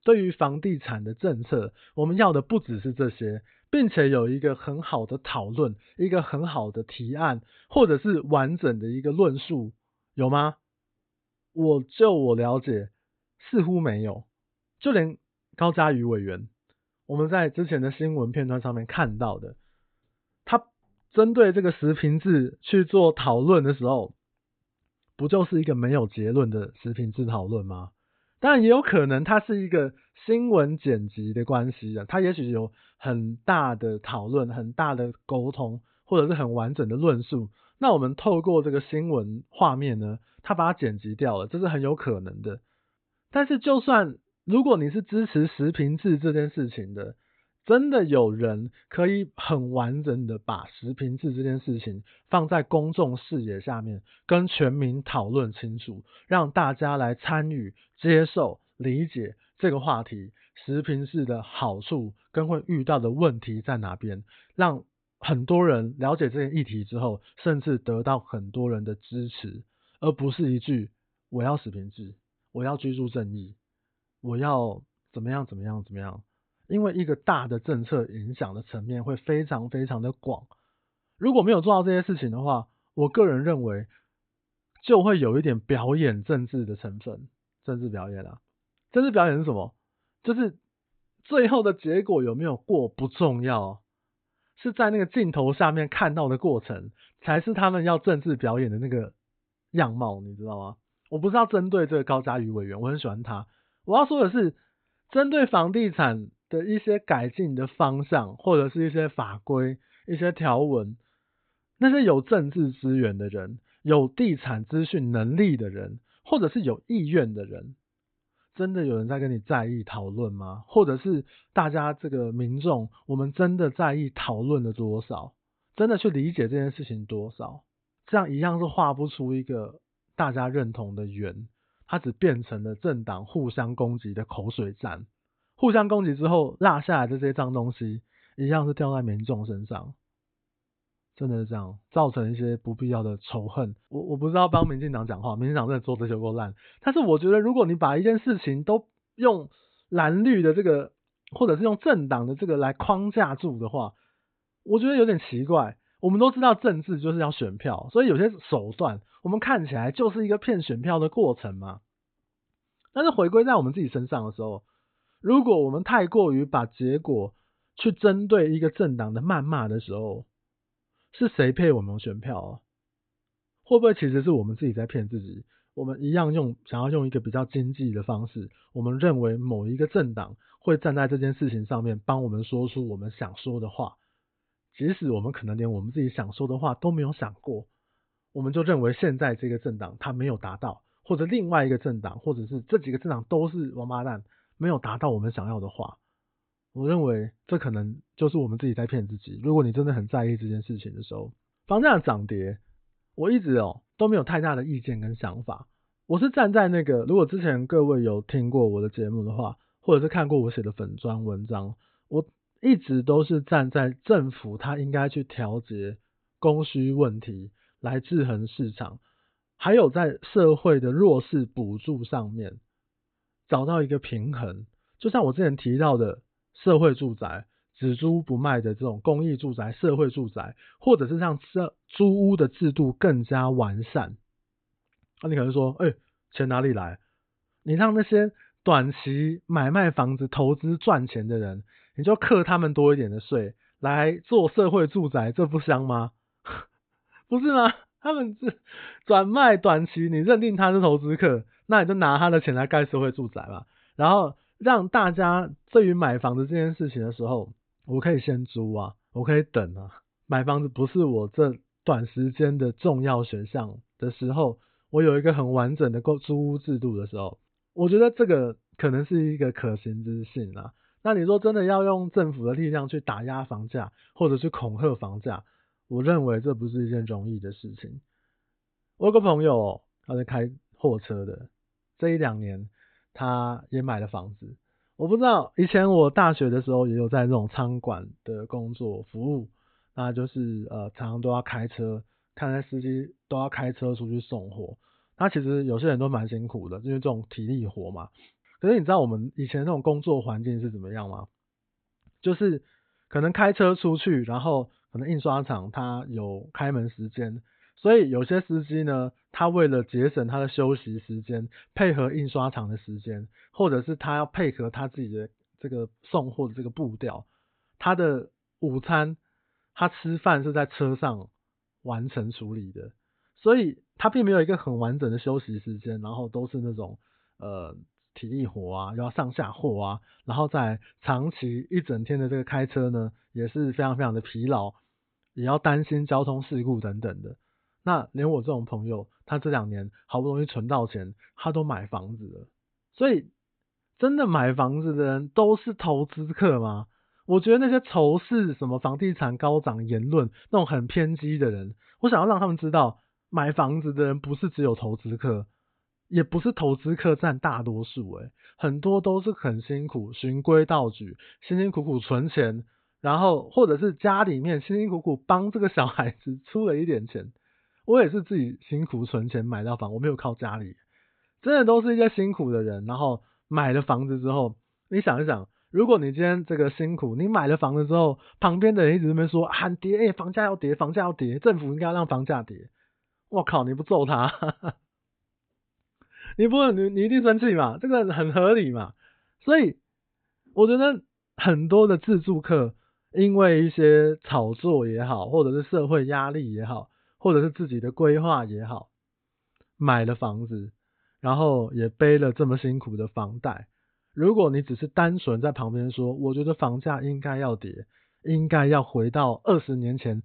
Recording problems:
high frequencies cut off; severe; nothing above 4 kHz

